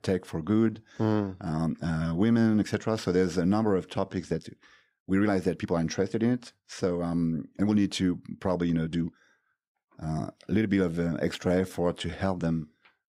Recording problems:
uneven, jittery; strongly; from 0.5 to 13 s

